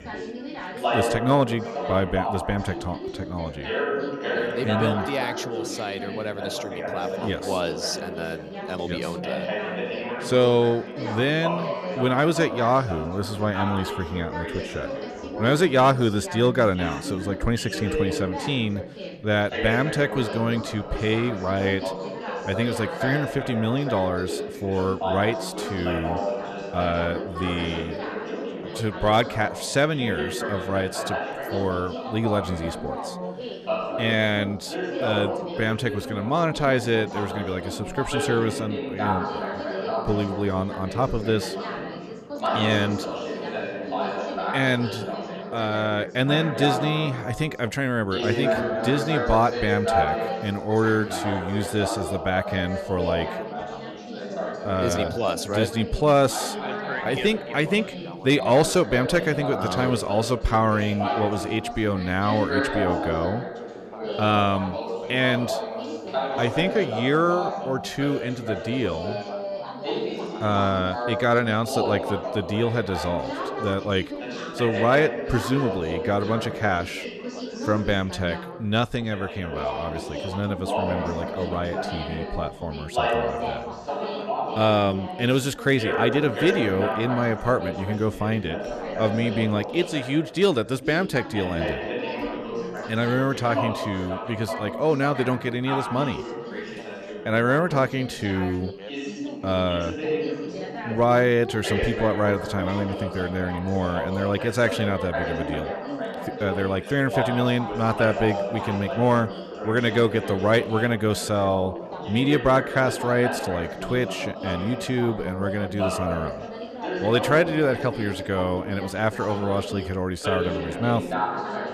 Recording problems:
background chatter; loud; throughout; 4 voices, 5 dB below the speech

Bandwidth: 13.5 kHz